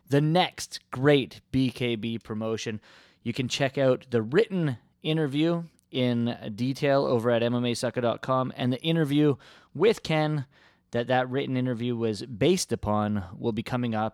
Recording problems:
none

